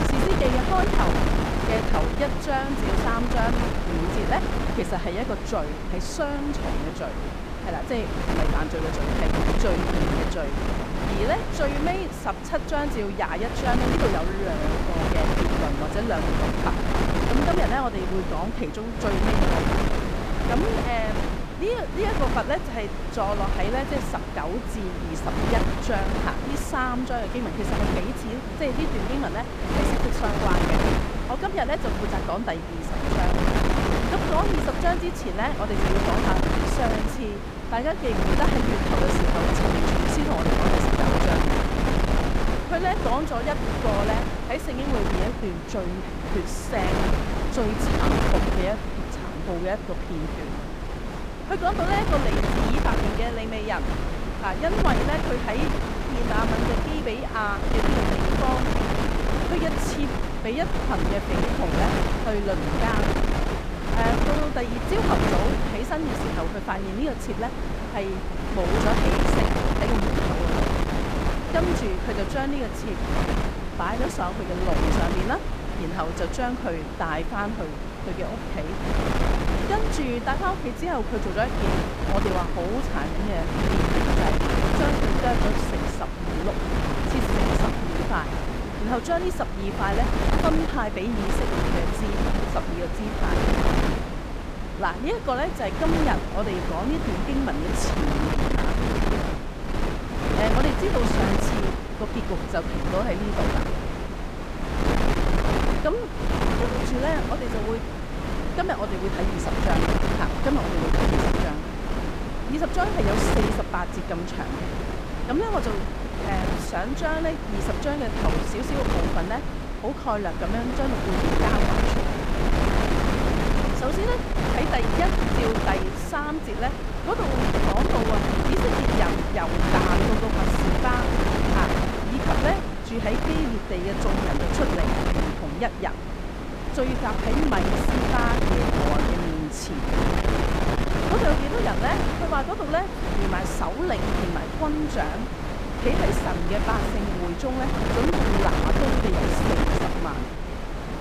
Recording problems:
wind noise on the microphone; heavy; as loud as the speech

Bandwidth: 15 kHz